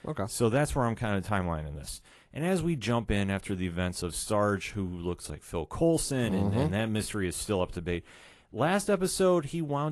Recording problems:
garbled, watery; slightly; nothing above 11.5 kHz
abrupt cut into speech; at the end

